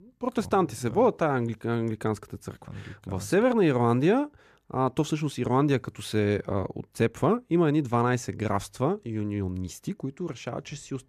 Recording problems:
none

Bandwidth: 14.5 kHz